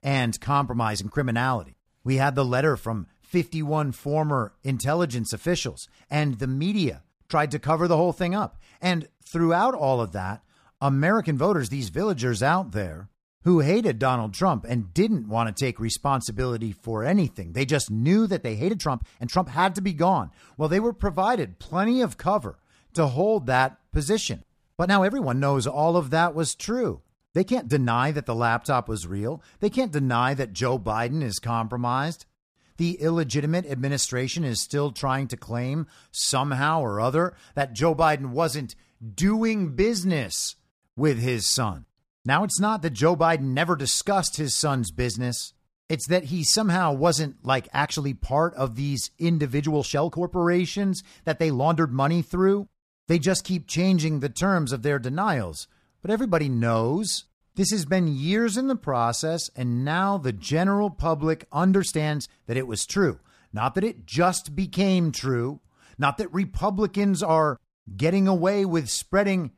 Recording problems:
uneven, jittery; strongly; from 1 s to 1:02

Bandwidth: 14.5 kHz